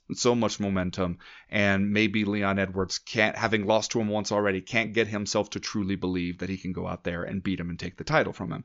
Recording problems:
high frequencies cut off; noticeable; nothing above 7 kHz

